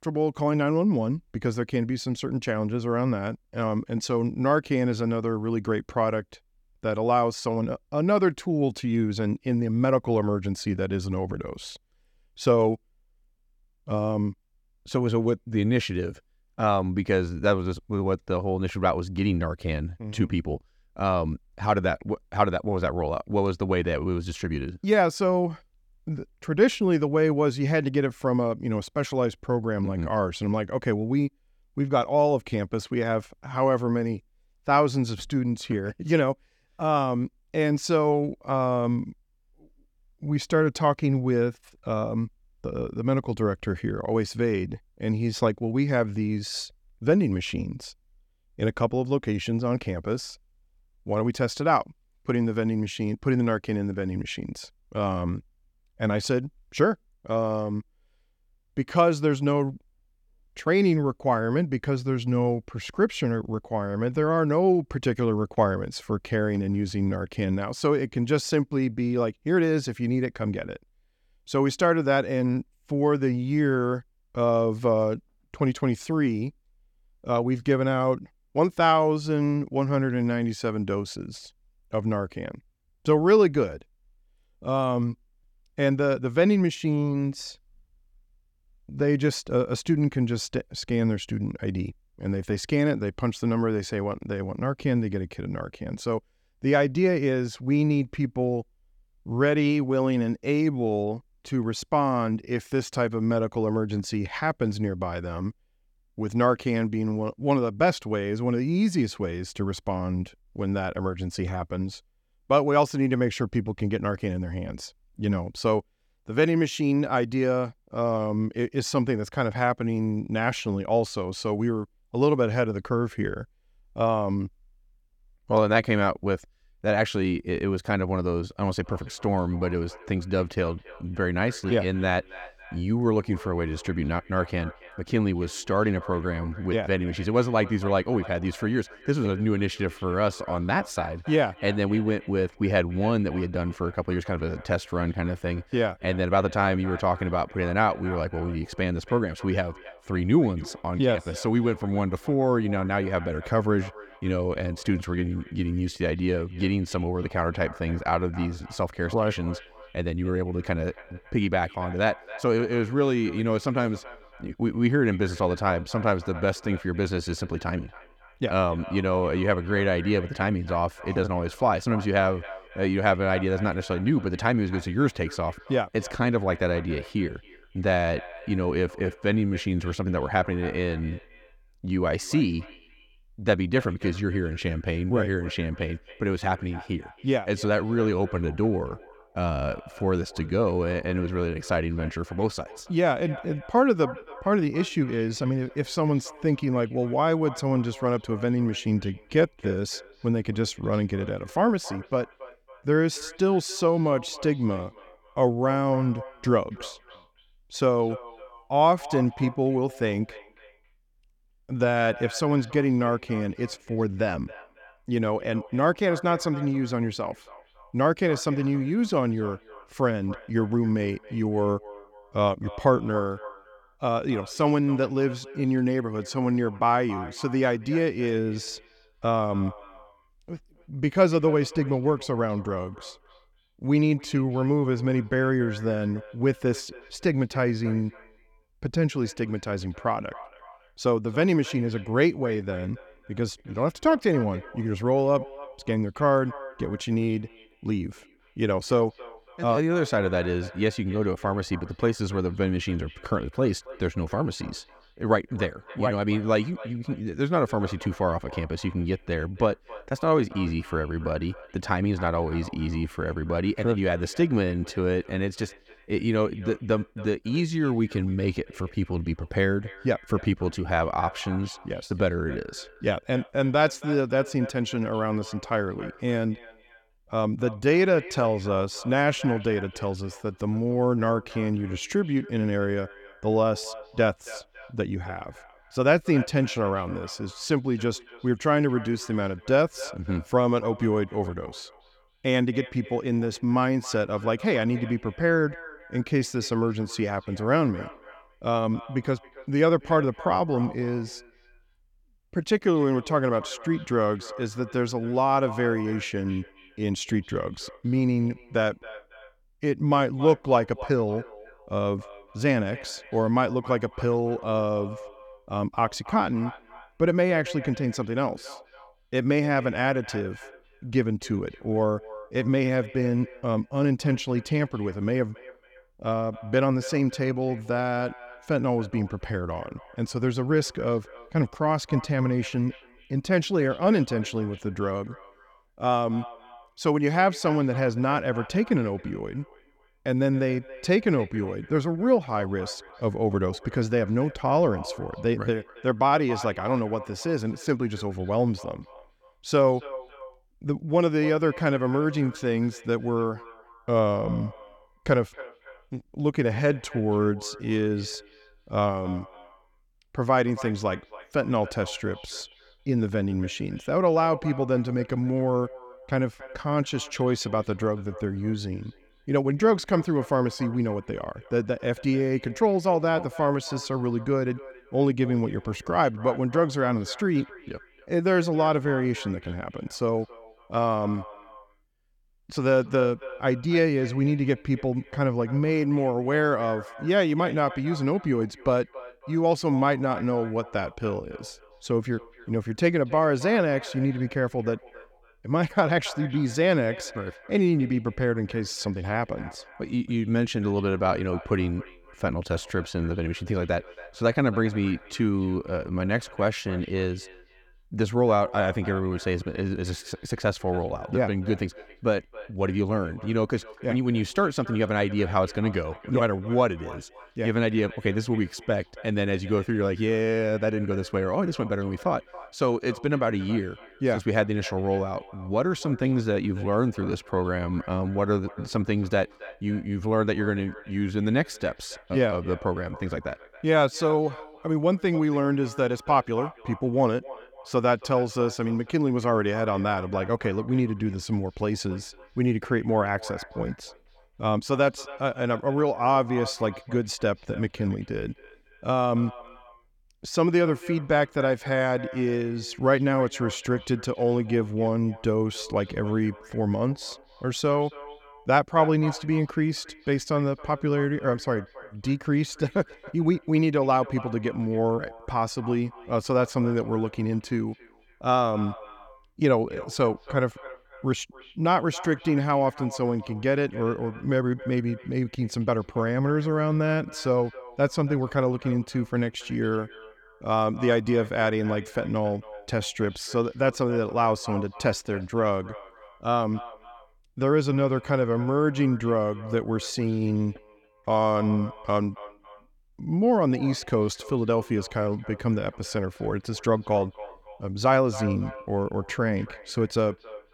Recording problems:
echo of what is said; faint; from 2:09 on; 280 ms later, 20 dB below the speech

